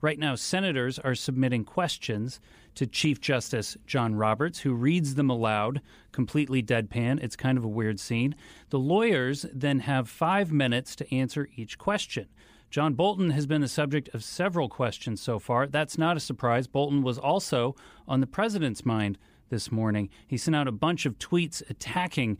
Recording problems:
none

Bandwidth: 15 kHz